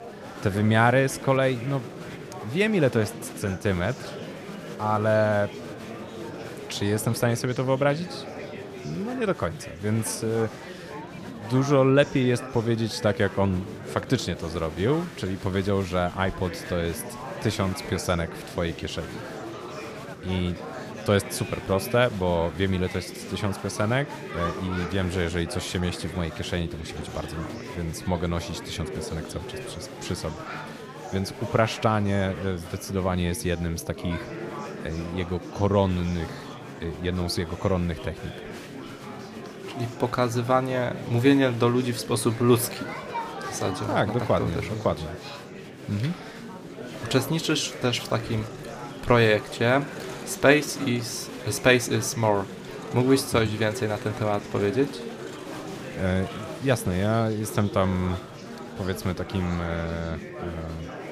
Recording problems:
murmuring crowd; noticeable; throughout; 10 dB below the speech

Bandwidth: 15 kHz